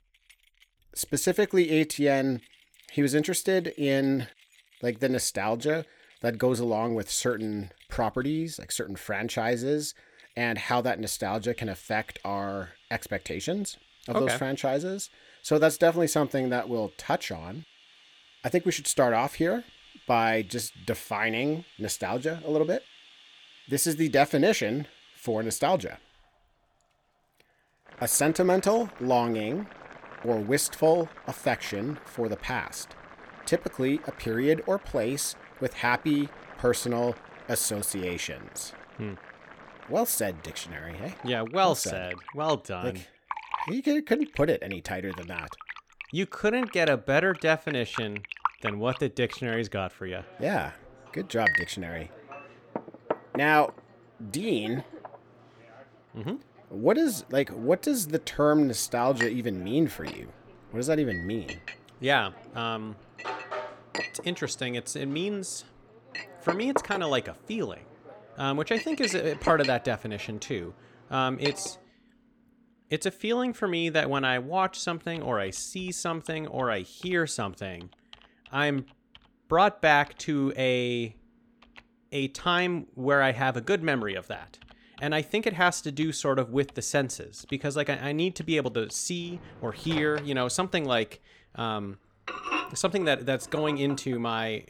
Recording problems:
household noises; noticeable; throughout; 10 dB below the speech

